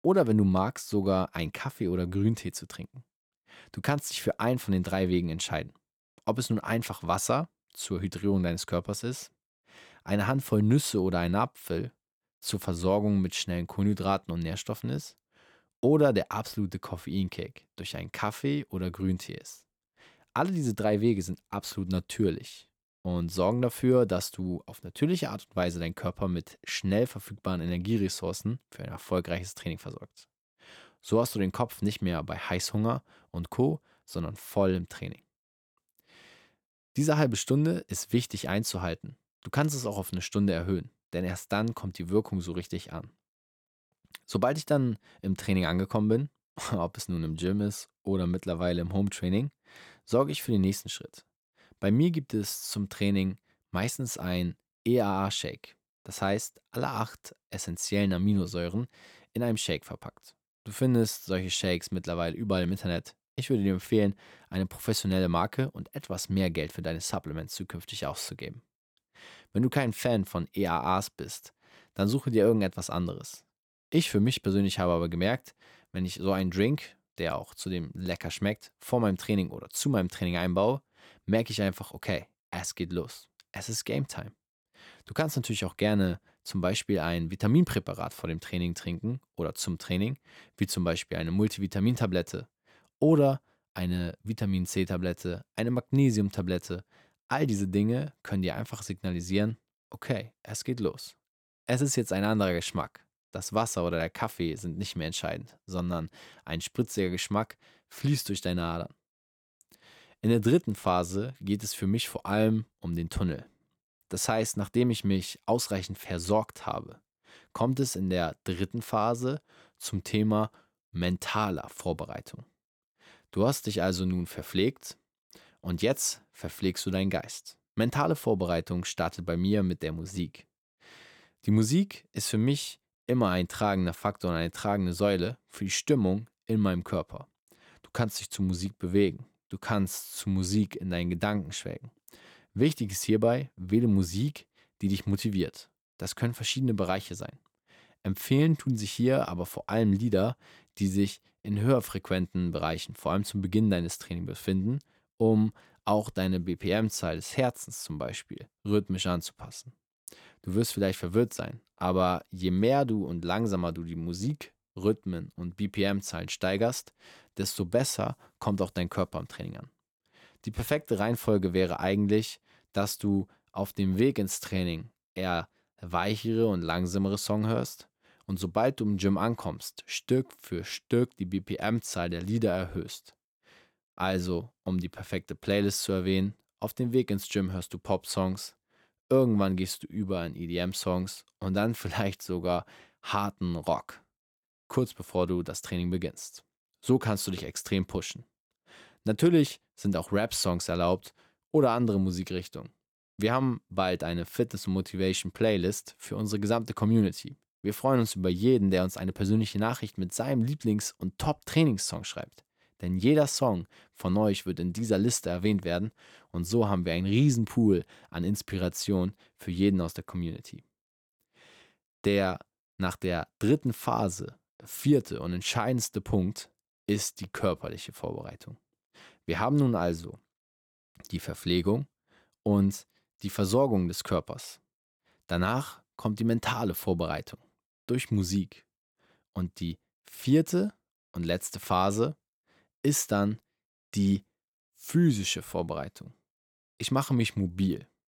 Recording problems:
none

